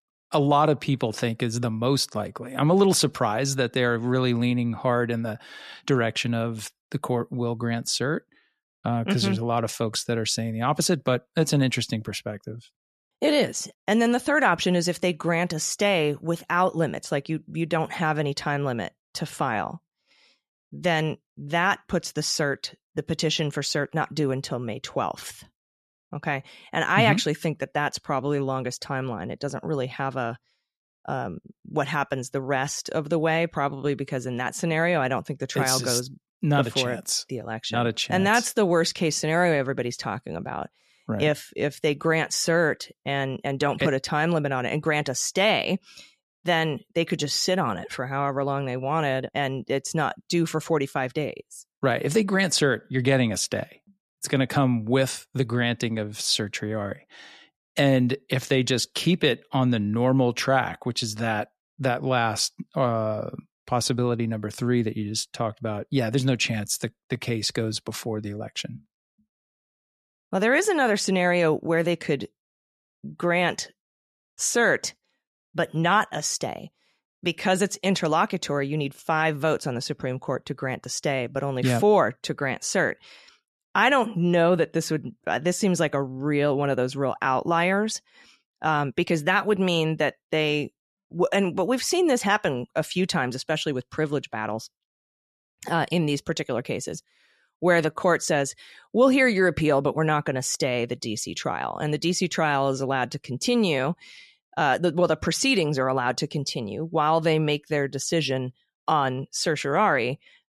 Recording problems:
none

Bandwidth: 13.5 kHz